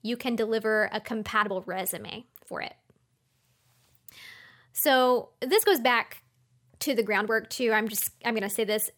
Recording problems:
uneven, jittery; strongly; from 0.5 to 8.5 s

